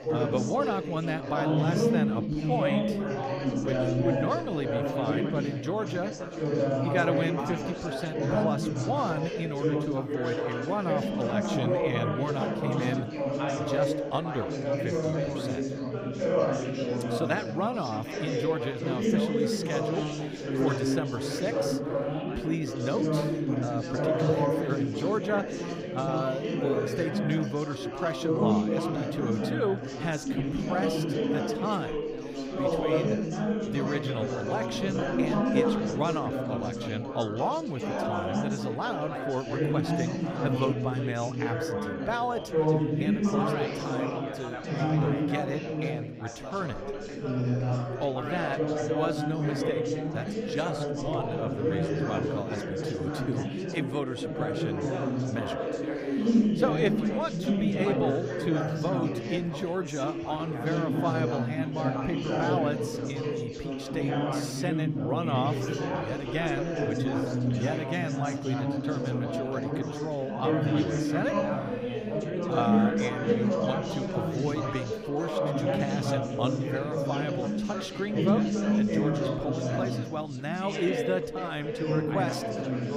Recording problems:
chatter from many people; very loud; throughout; 4 dB above the speech

